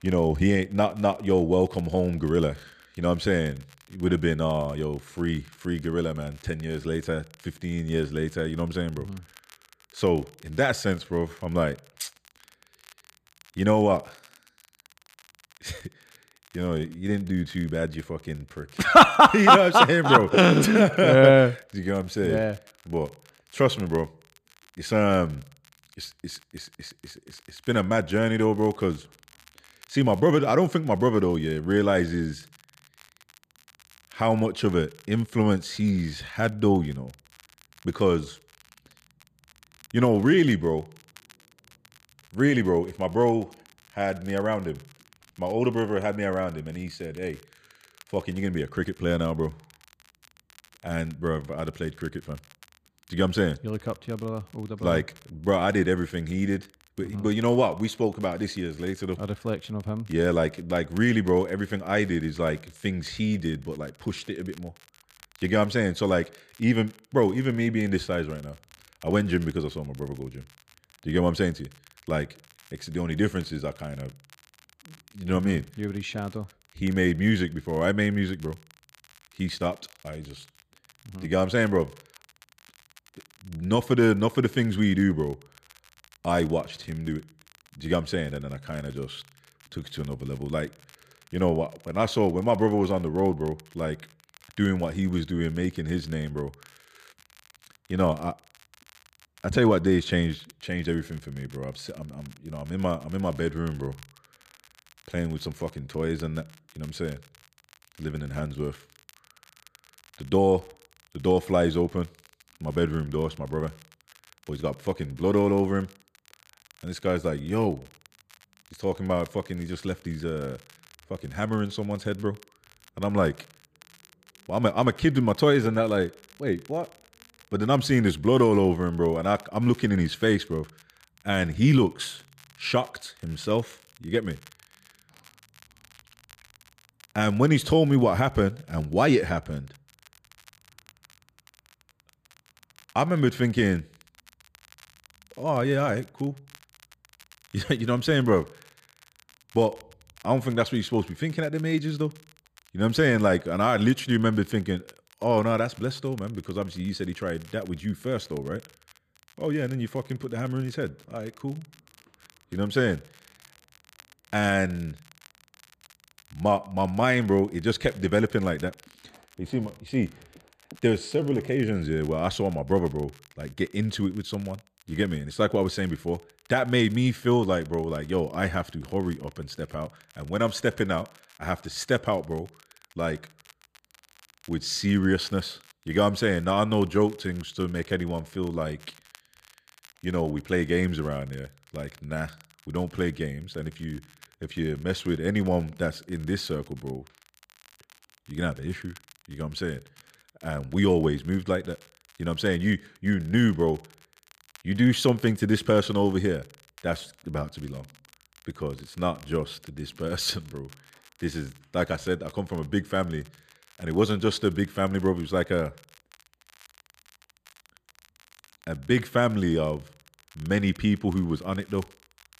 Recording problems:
crackle, like an old record; faint; 30 dB below the speech

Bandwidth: 14.5 kHz